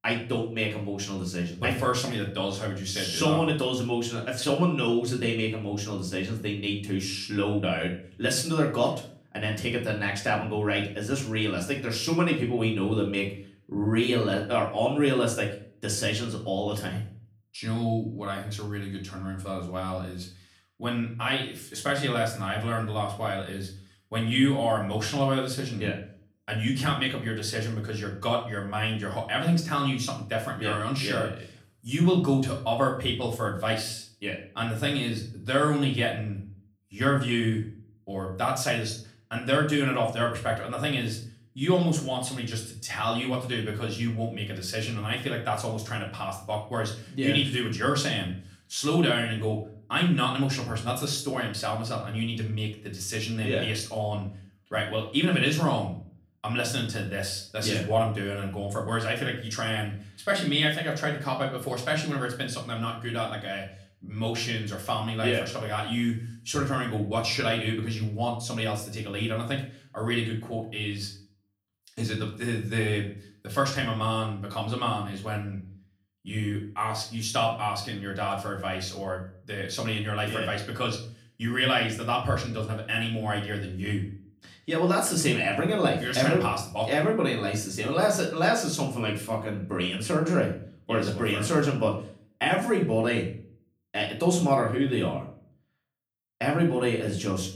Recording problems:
off-mic speech; far
room echo; slight; dies away in 0.4 s

